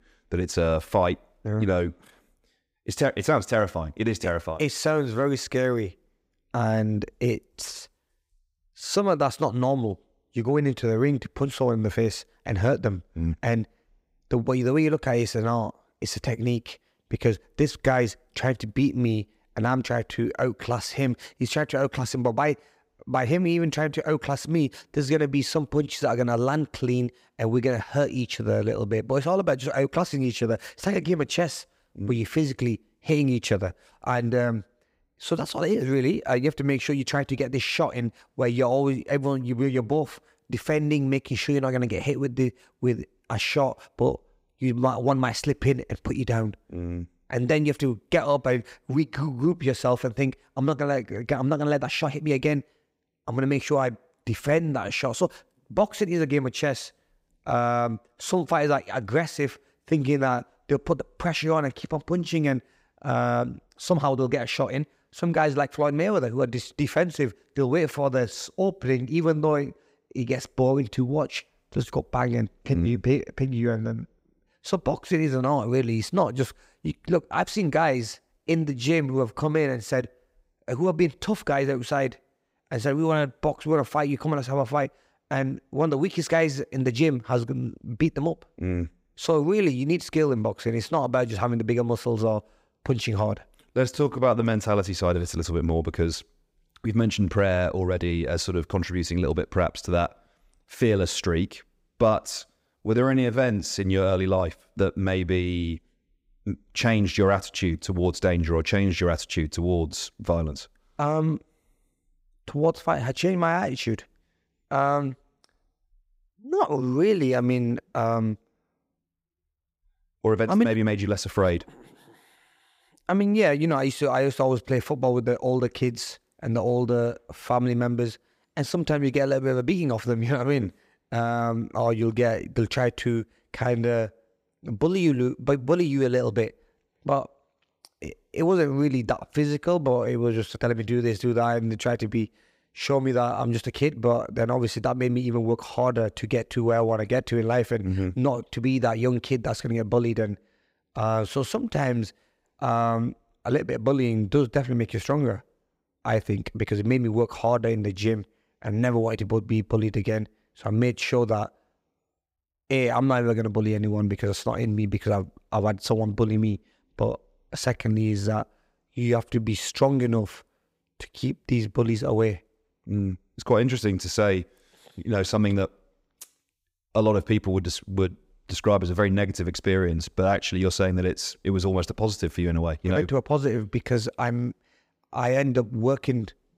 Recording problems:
uneven, jittery; strongly; from 51 s to 2:37

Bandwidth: 15.5 kHz